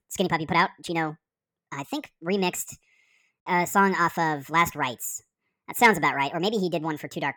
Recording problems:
wrong speed and pitch; too fast and too high; 1.5 times normal speed

